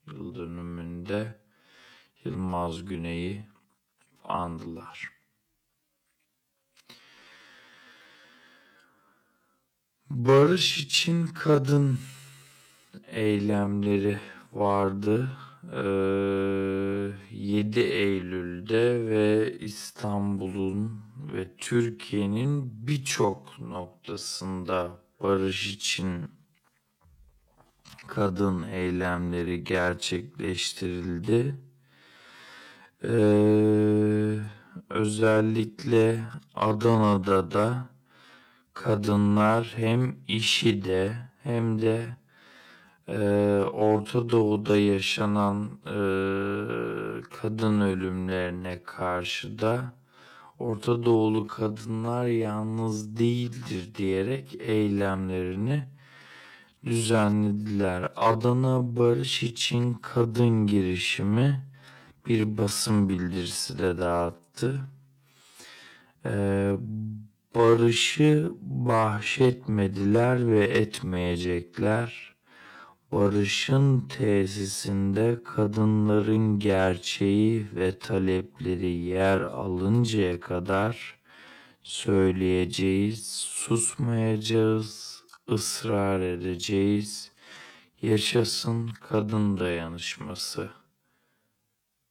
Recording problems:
wrong speed, natural pitch; too slow; 0.5 times normal speed

